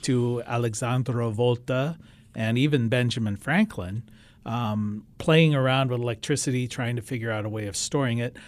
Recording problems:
none

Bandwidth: 14.5 kHz